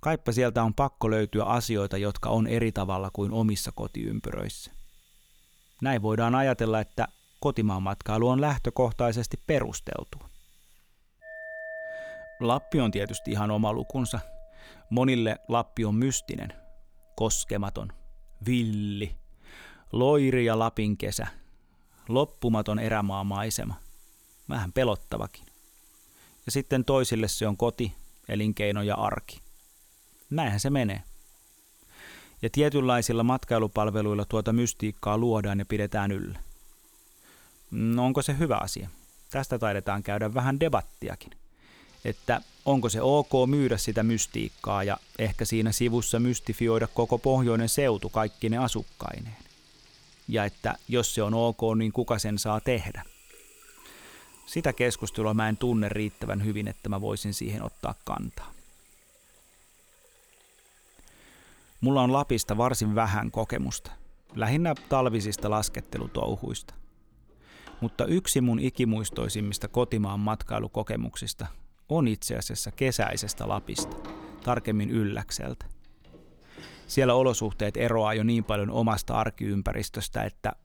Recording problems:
household noises; faint; throughout; 25 dB below the speech

